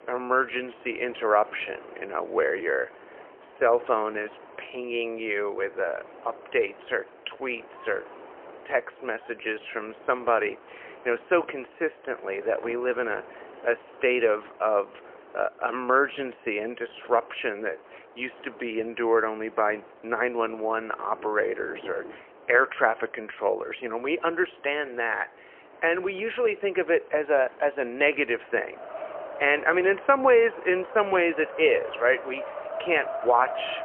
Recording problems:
phone-call audio; poor line; nothing above 3 kHz
wind in the background; noticeable; throughout; 15 dB below the speech

